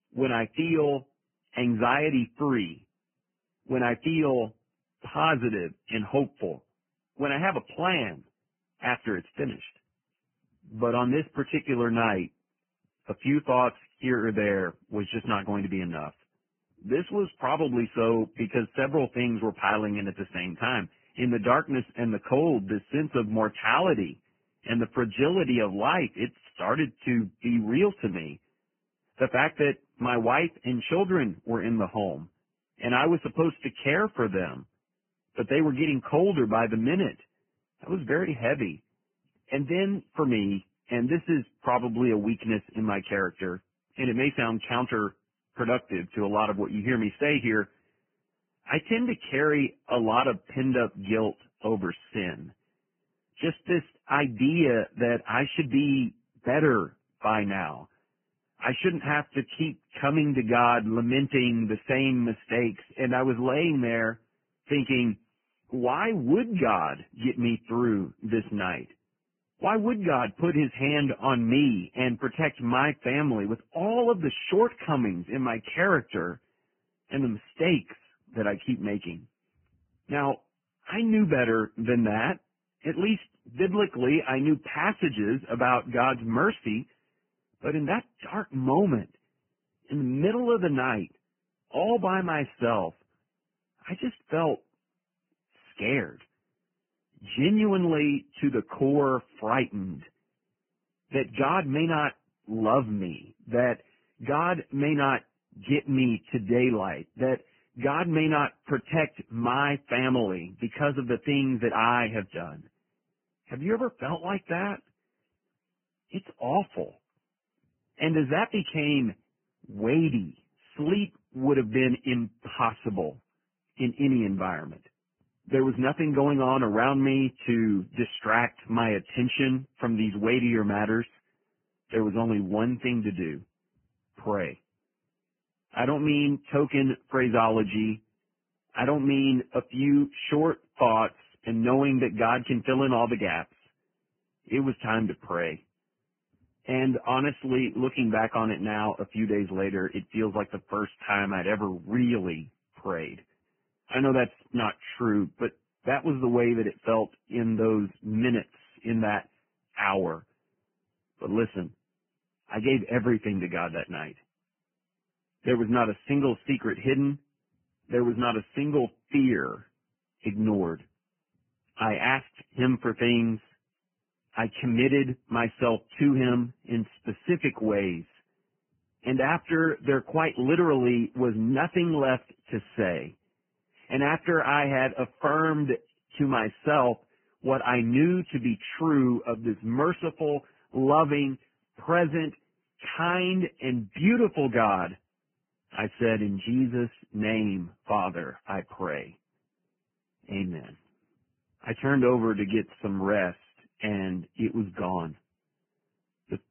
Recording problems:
garbled, watery; badly
high frequencies cut off; severe; nothing above 3 kHz

